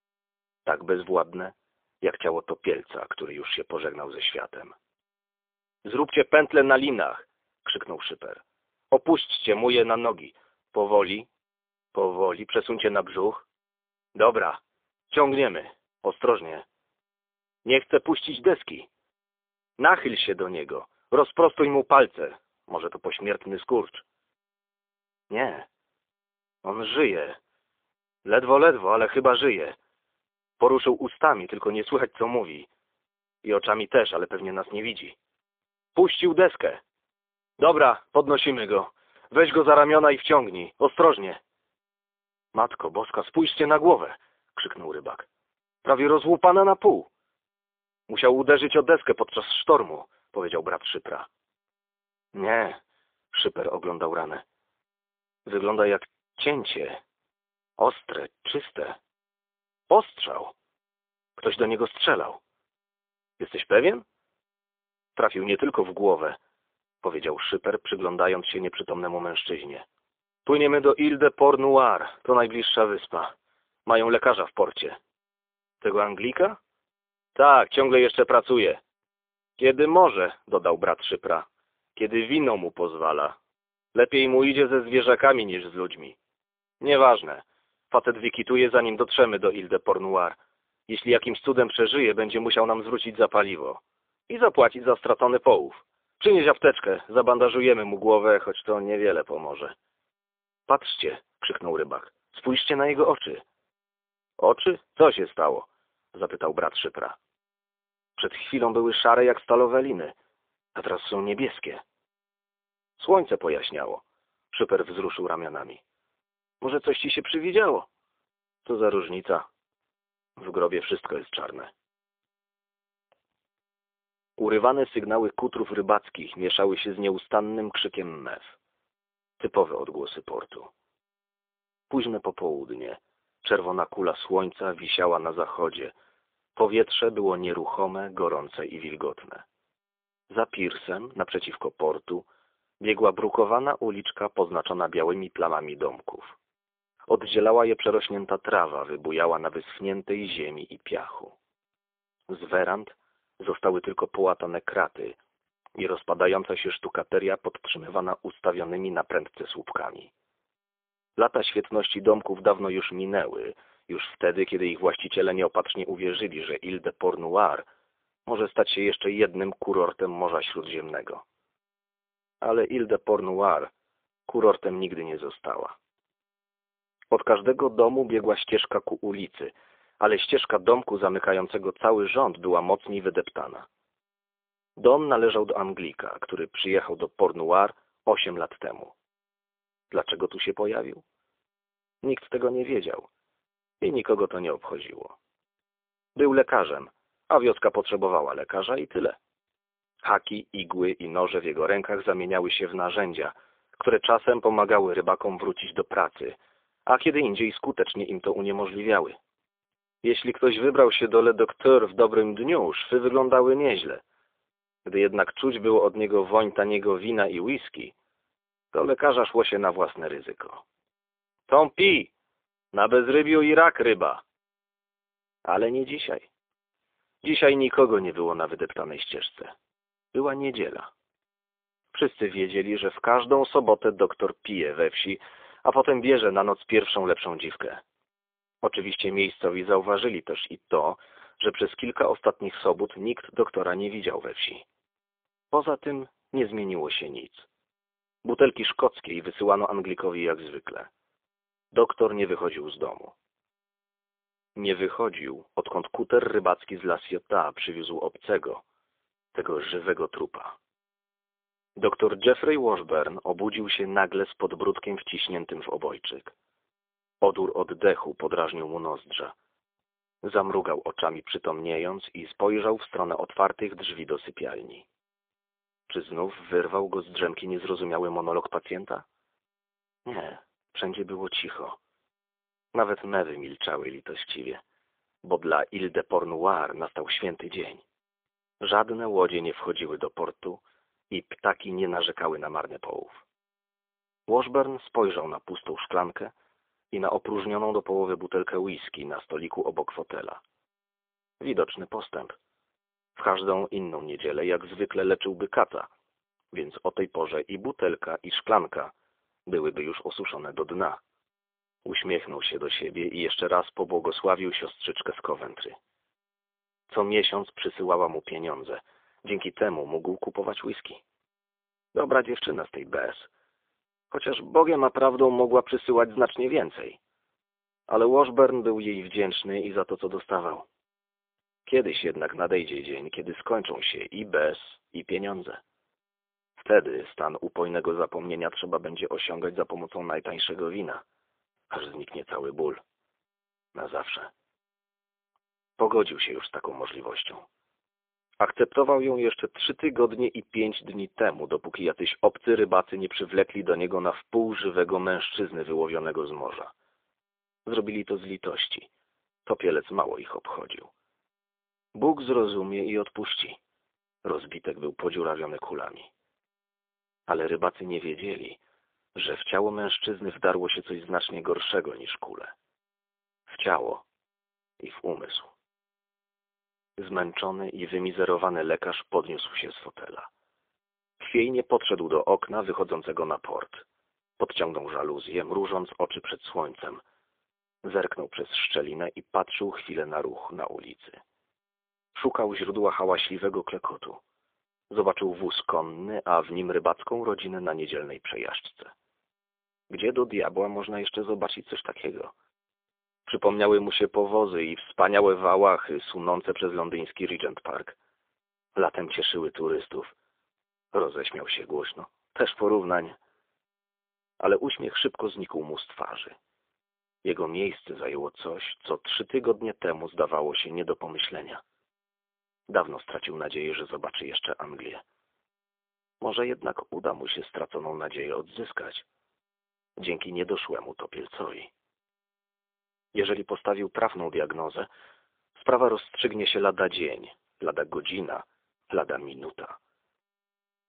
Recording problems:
phone-call audio; poor line; nothing above 3.5 kHz

